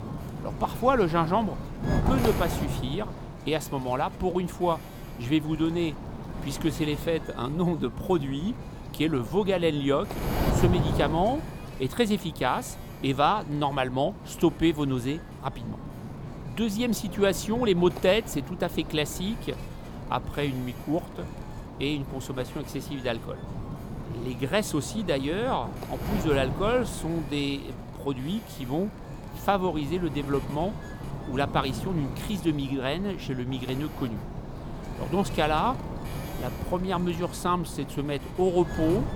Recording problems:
wind noise on the microphone; occasional gusts; 10 dB below the speech
murmuring crowd; faint; throughout; 25 dB below the speech

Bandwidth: 18.5 kHz